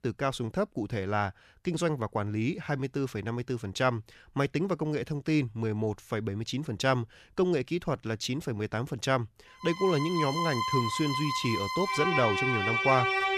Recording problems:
background music; very loud; from 9.5 s on; 1 dB above the speech

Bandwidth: 14 kHz